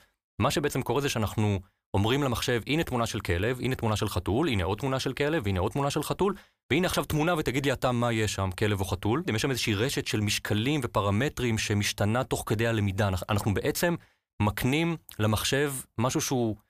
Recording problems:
none

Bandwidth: 15 kHz